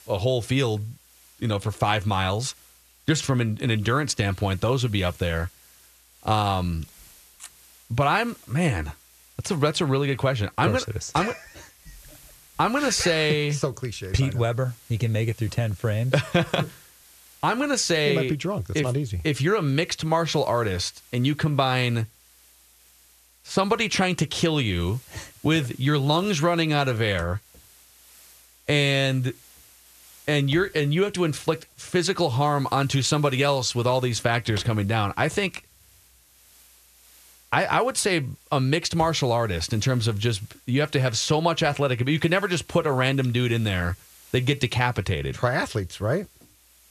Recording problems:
hiss; faint; throughout; 25 dB below the speech

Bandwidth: 14 kHz